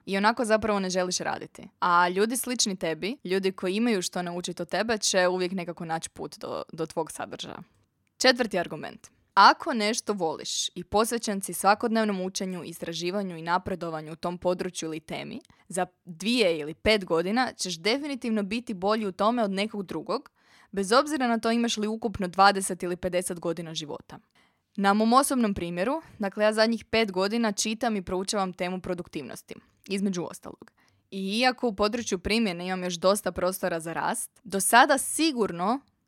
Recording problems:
none

